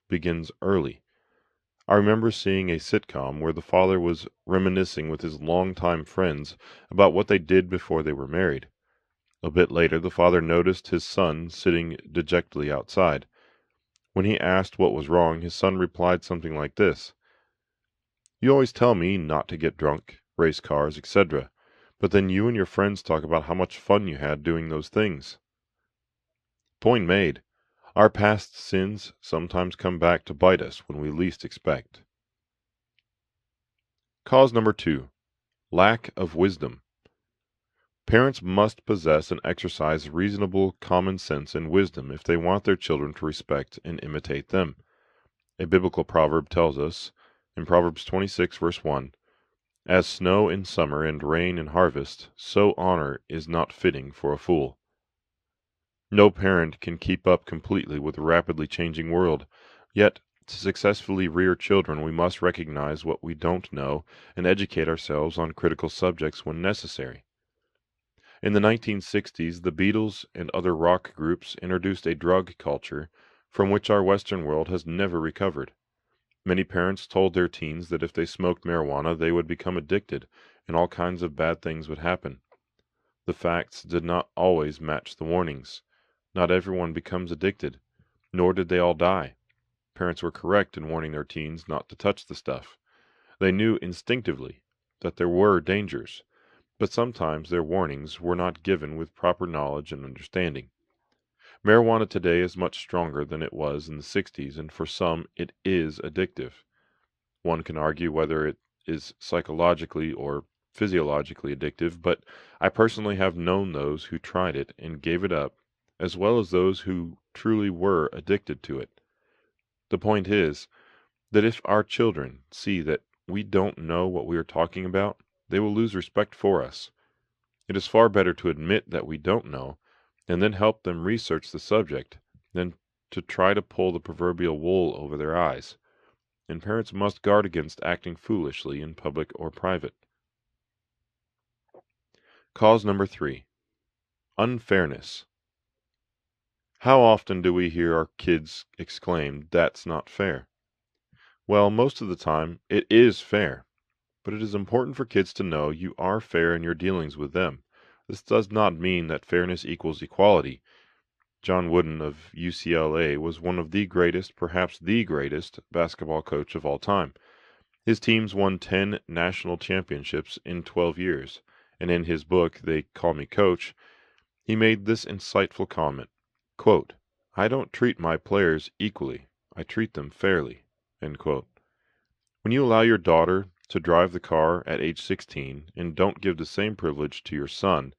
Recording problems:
muffled; very slightly; fading above 3 kHz

